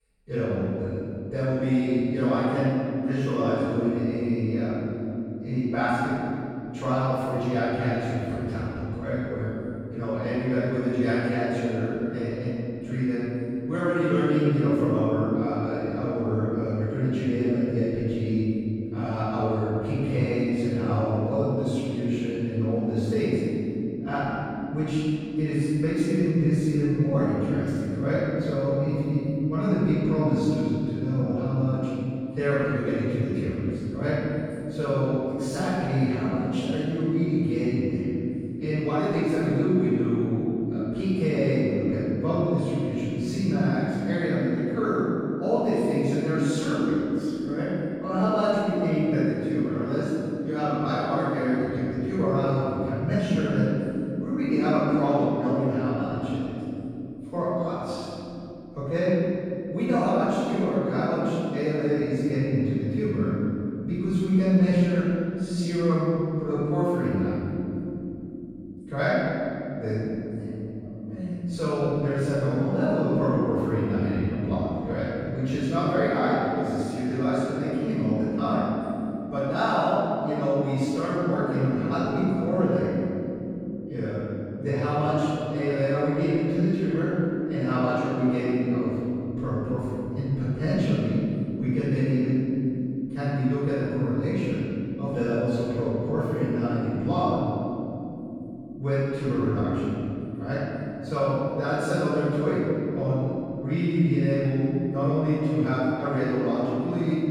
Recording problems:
room echo; strong; dies away in 3 s
off-mic speech; far

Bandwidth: 17.5 kHz